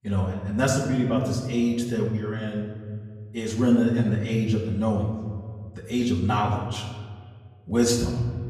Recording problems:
off-mic speech; far
room echo; noticeable; dies away in 1.6 s
echo of what is said; faint; throughout; 210 ms later, 20 dB below the speech

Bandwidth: 15.5 kHz